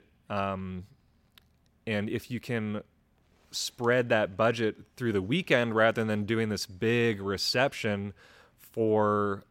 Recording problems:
none

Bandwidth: 16.5 kHz